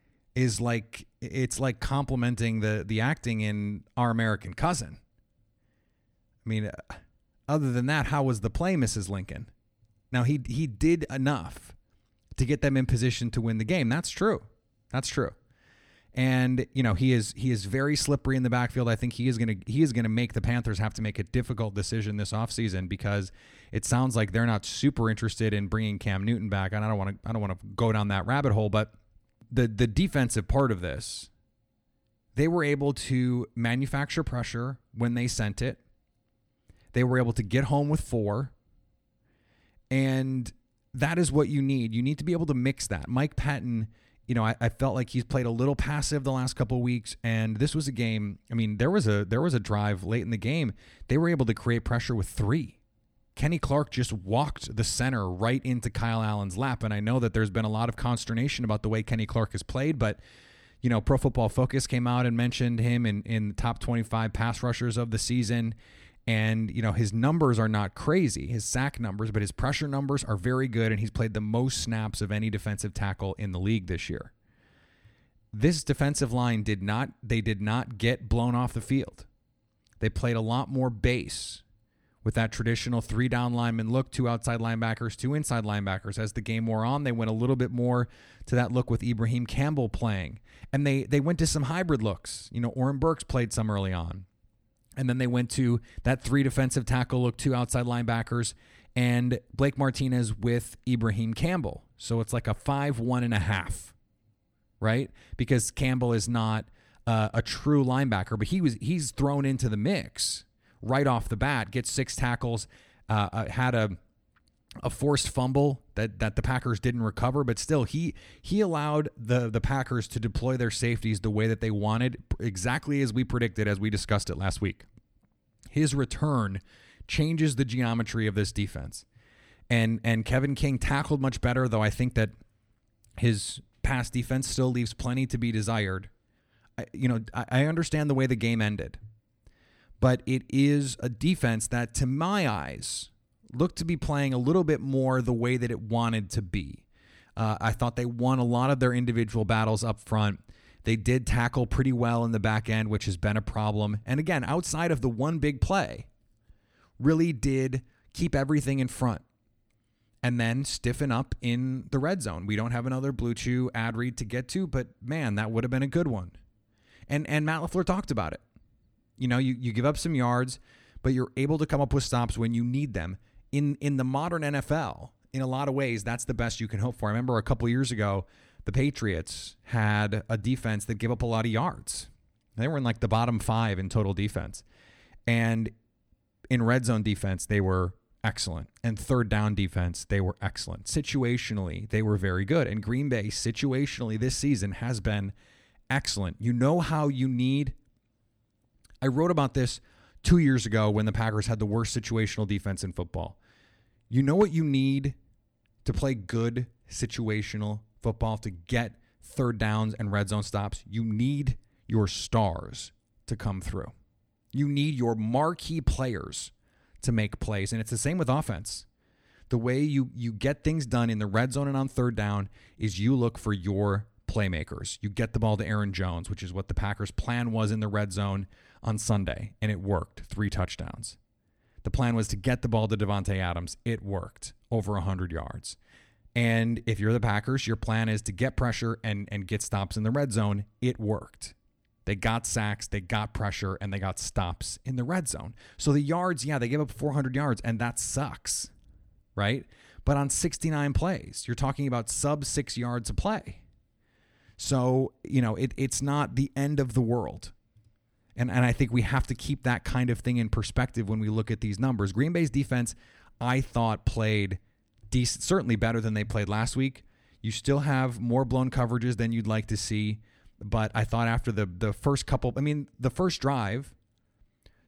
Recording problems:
none

